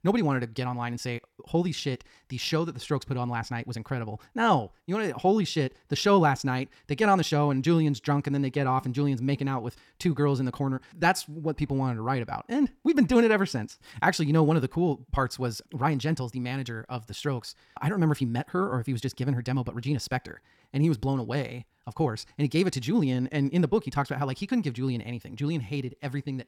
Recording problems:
wrong speed, natural pitch; too fast; 1.5 times normal speed

